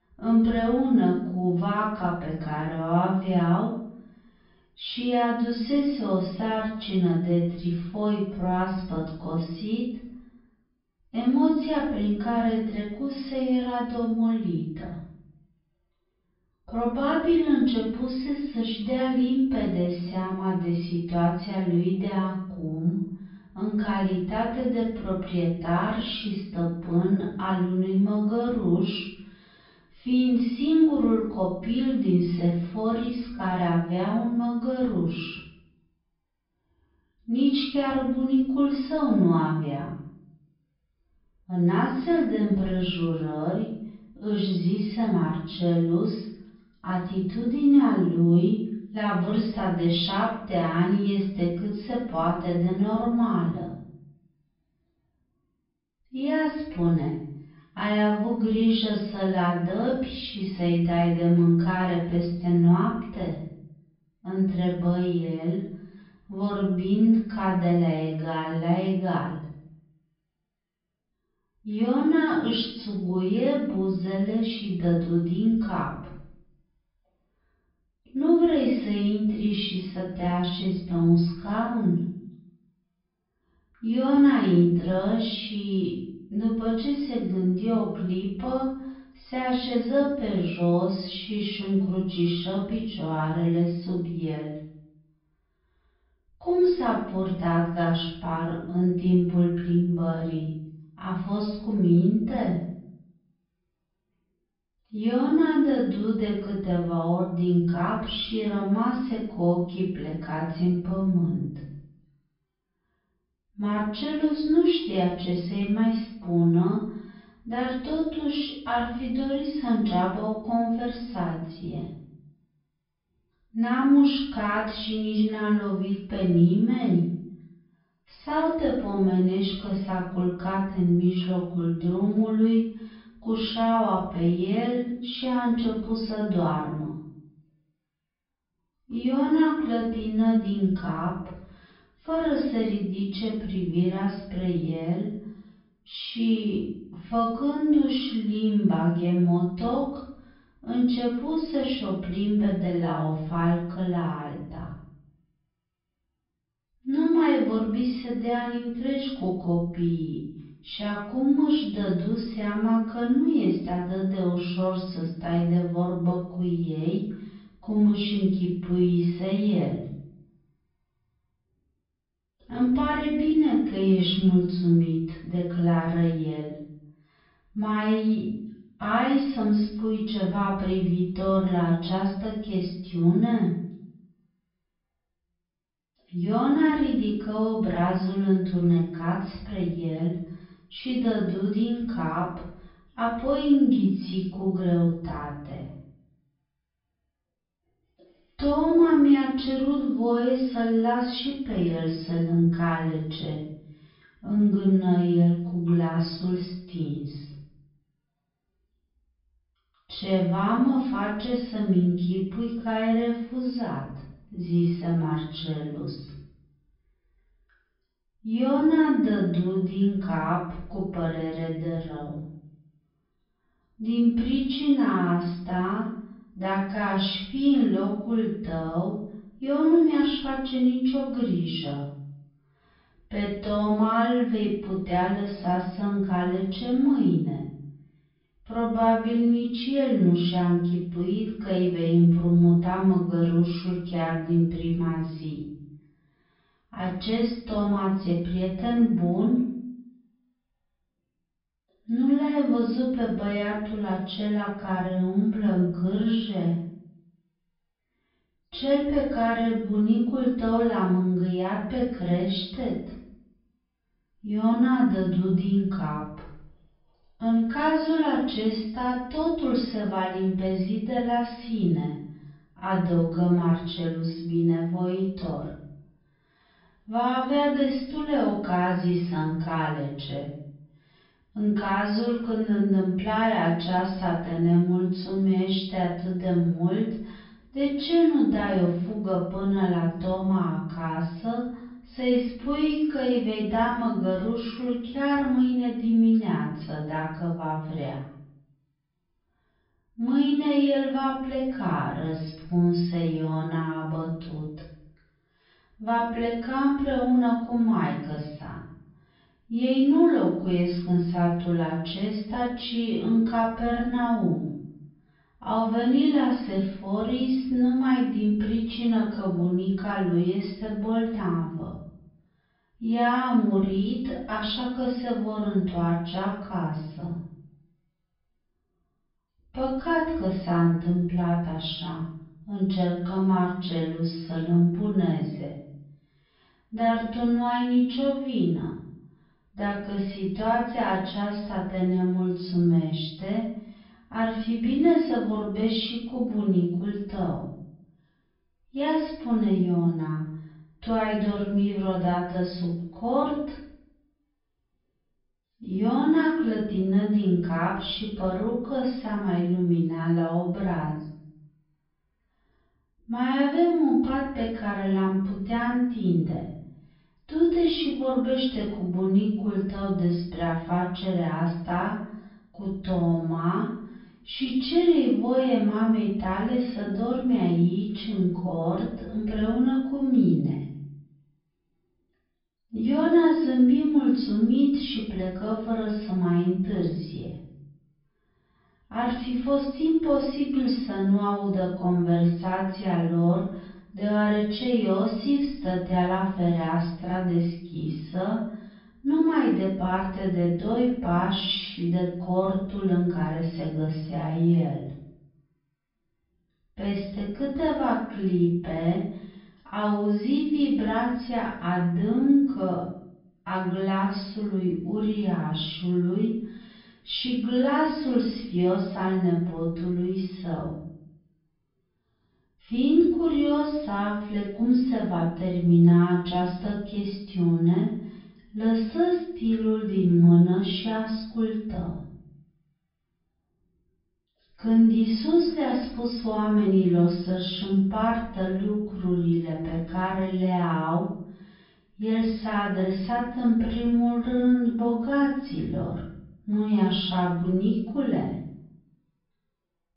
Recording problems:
off-mic speech; far
wrong speed, natural pitch; too slow; 0.6 times normal speed
room echo; noticeable; dies away in 0.6 s
high frequencies cut off; noticeable; nothing above 5.5 kHz

